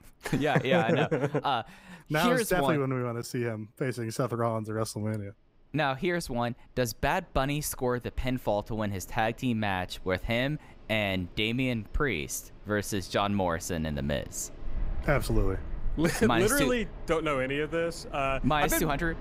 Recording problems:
wind in the background; noticeable; throughout; 15 dB below the speech

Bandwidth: 15.5 kHz